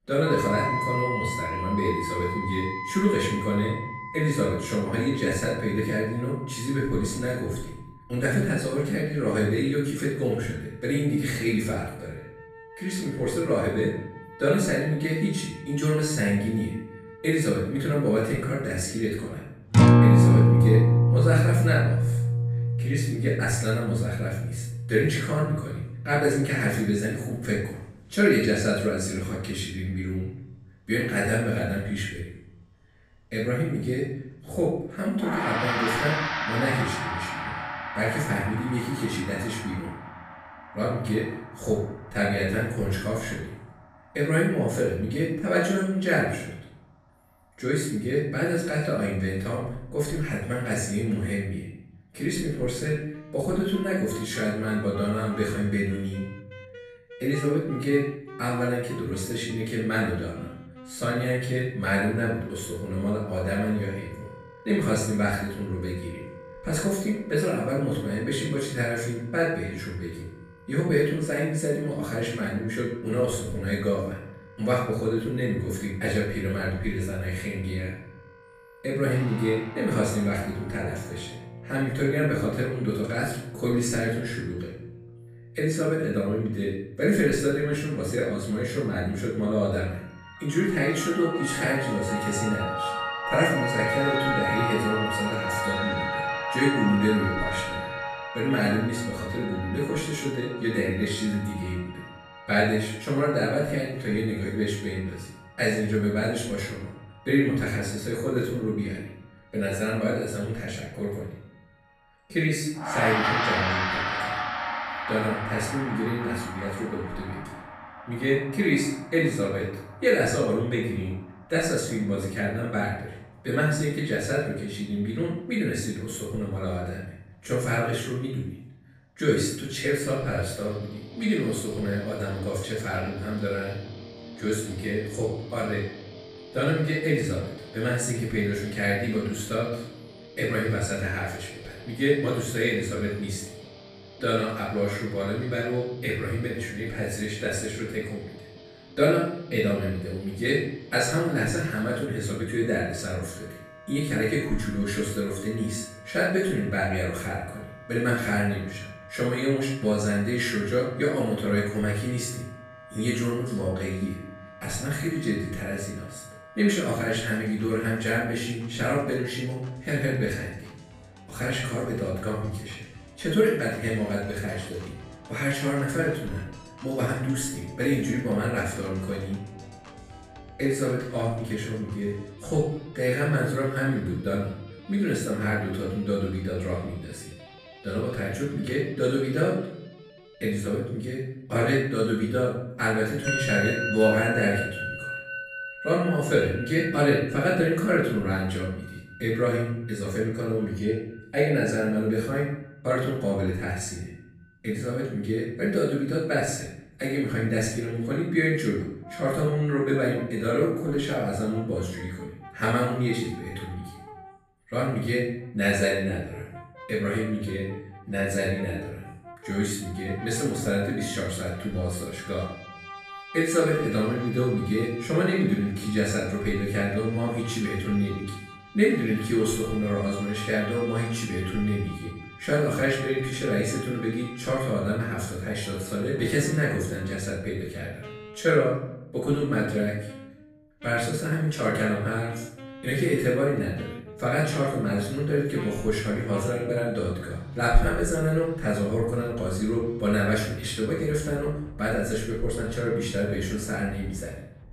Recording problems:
off-mic speech; far
room echo; noticeable; dies away in 0.7 s
background music; loud; throughout; 4 dB below the speech

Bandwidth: 15 kHz